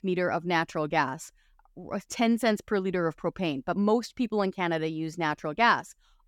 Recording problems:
none

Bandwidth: 17.5 kHz